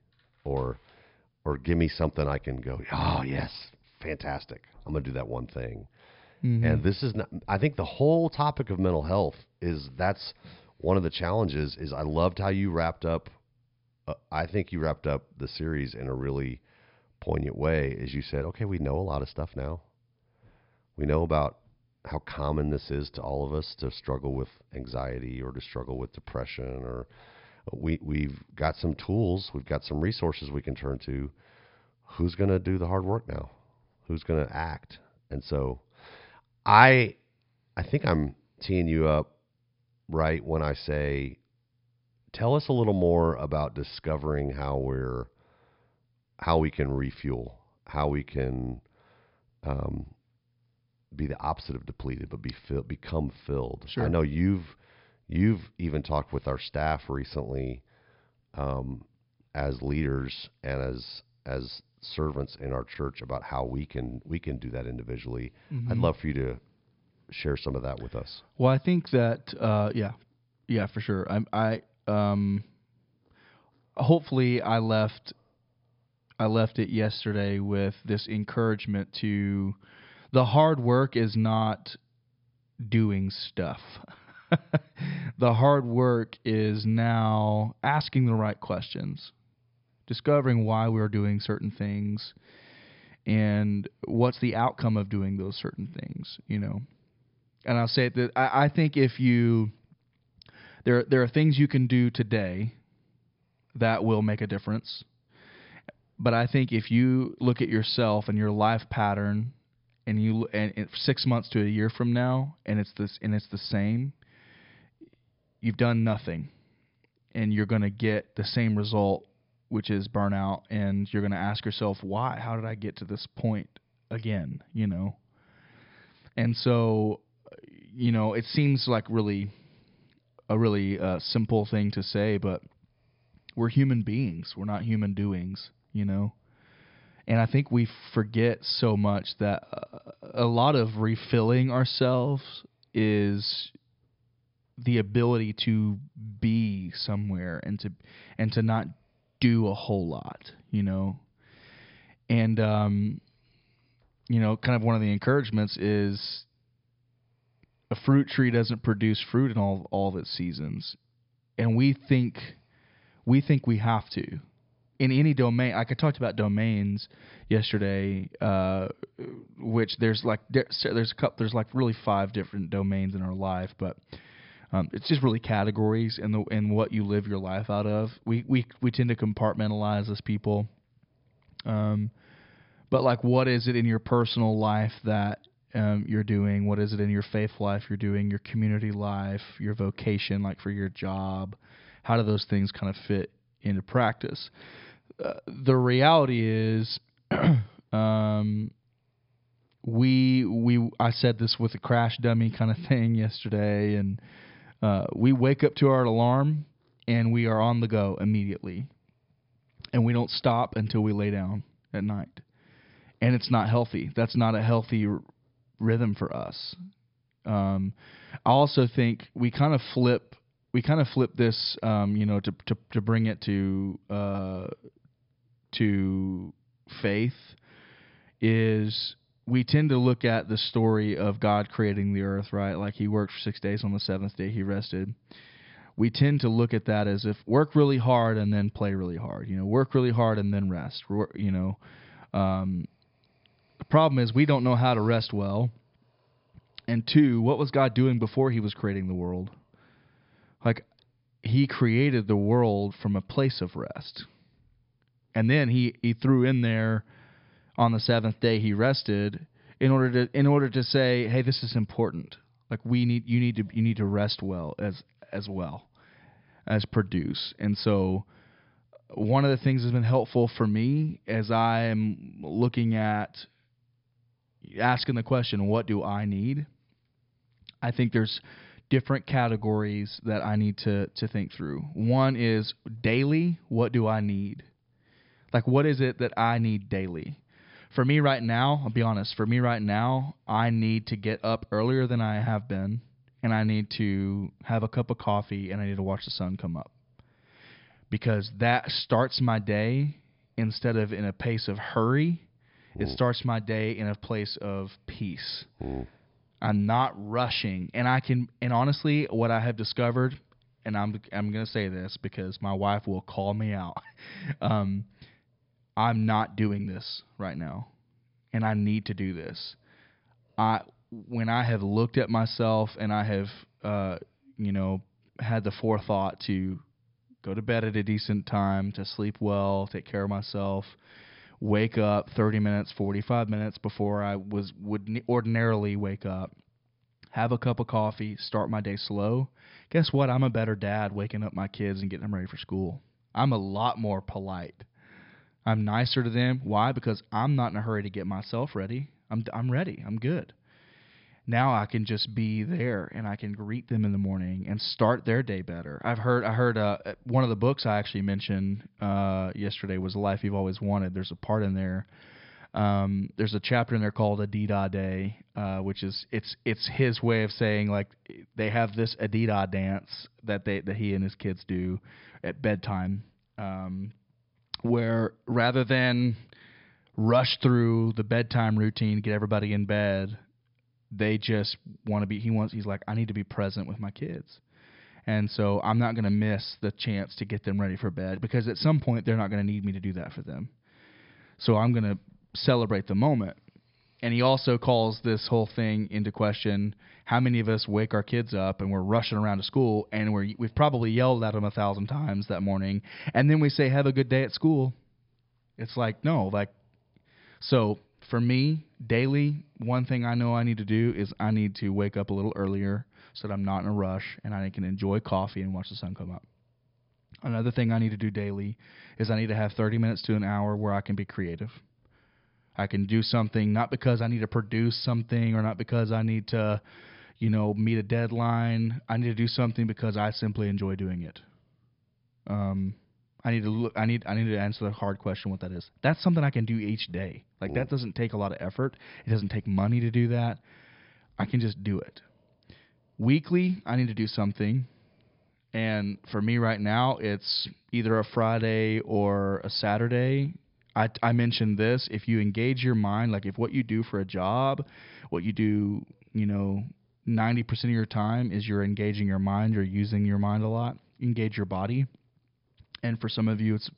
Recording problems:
high frequencies cut off; noticeable; nothing above 5.5 kHz

